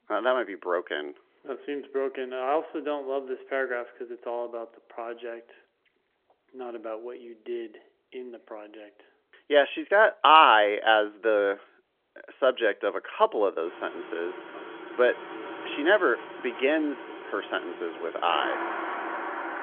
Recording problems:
phone-call audio; nothing above 3 kHz
traffic noise; noticeable; from 14 s on; 10 dB below the speech

